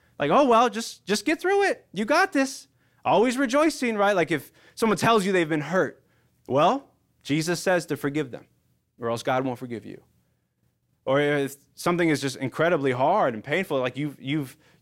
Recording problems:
none

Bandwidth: 16 kHz